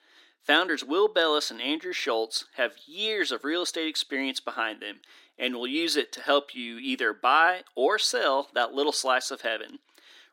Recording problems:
thin; somewhat; fading below 300 Hz

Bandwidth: 16 kHz